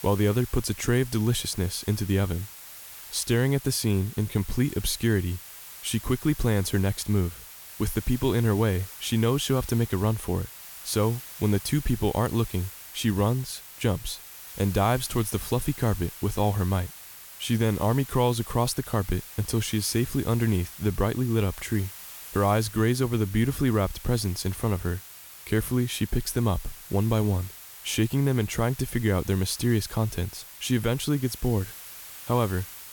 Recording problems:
hiss; noticeable; throughout; 15 dB below the speech

